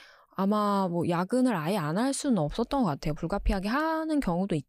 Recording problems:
none

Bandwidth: 15 kHz